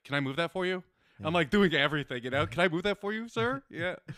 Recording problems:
none

